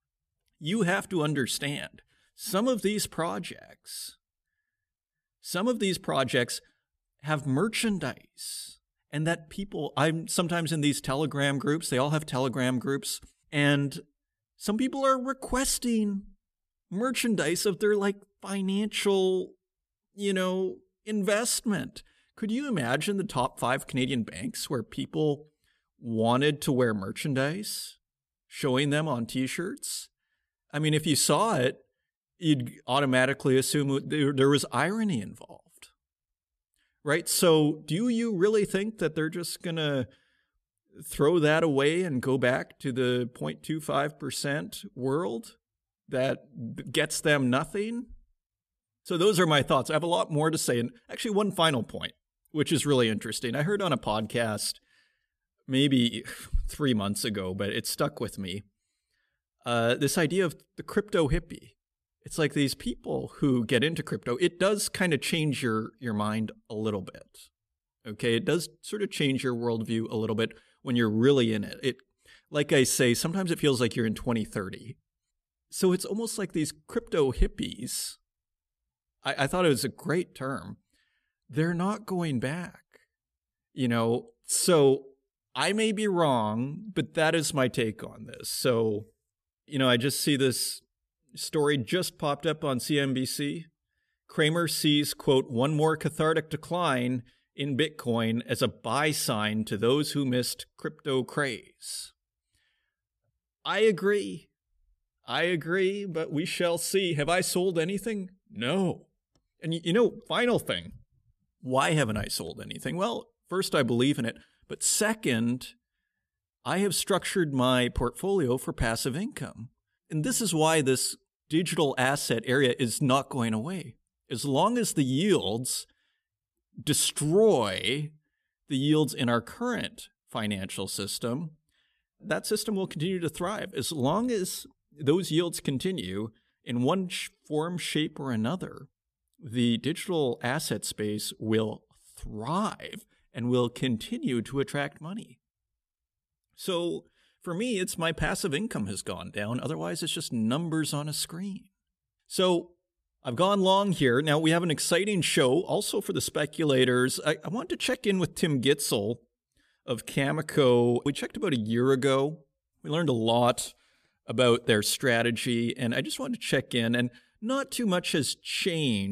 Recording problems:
abrupt cut into speech; at the end

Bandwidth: 14.5 kHz